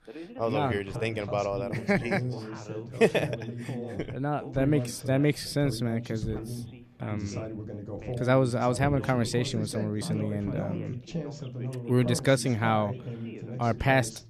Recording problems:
background chatter; loud; throughout; 2 voices, 9 dB below the speech

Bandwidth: 14 kHz